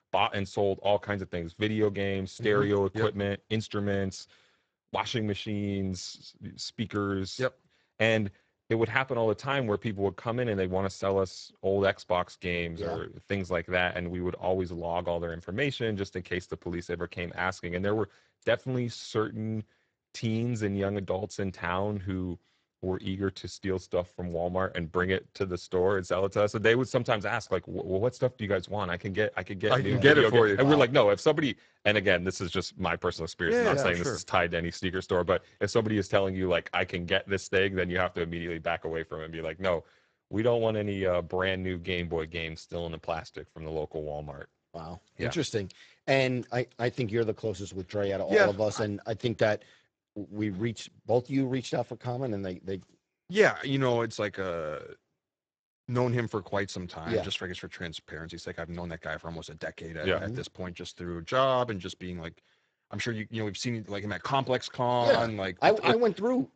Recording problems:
garbled, watery; badly; nothing above 8 kHz

